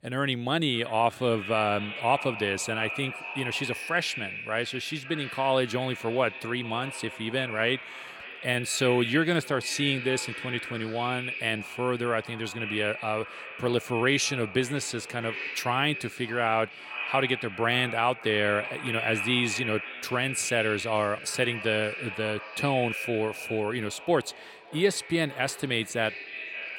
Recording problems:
echo of what is said; strong; throughout; 570 ms later, 7 dB below the speech

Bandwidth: 16.5 kHz